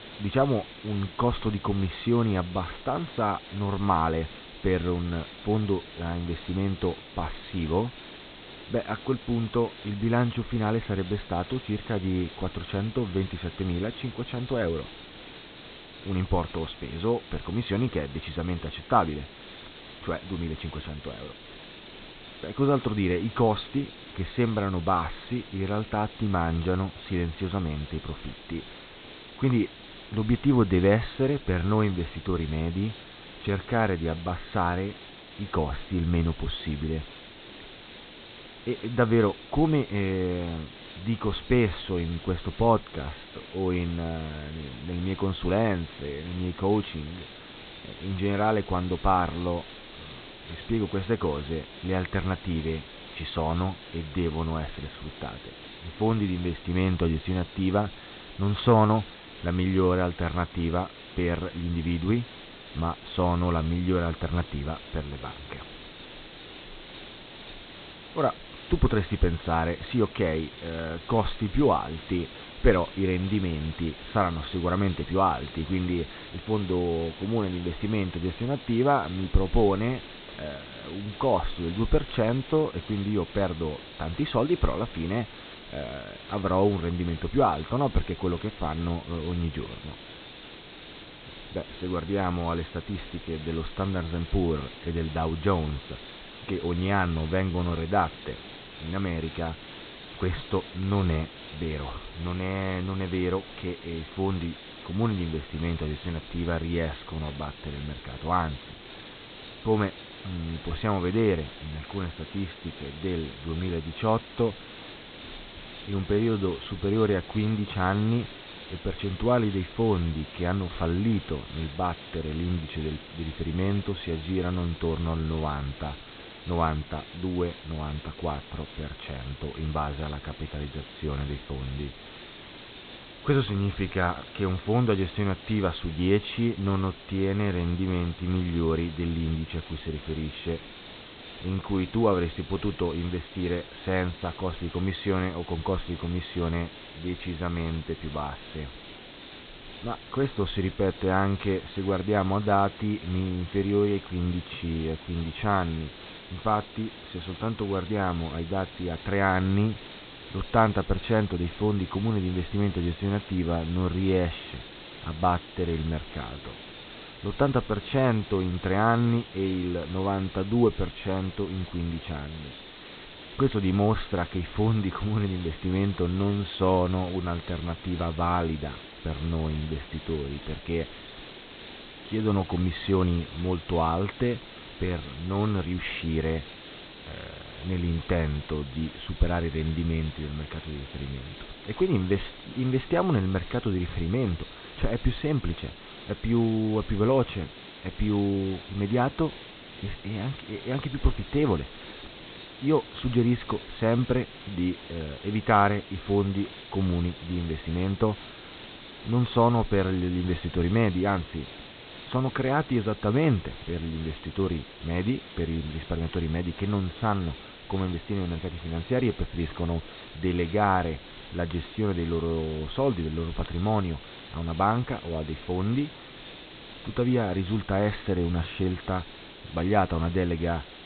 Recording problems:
high frequencies cut off; severe; nothing above 4 kHz
hiss; noticeable; throughout; 15 dB below the speech

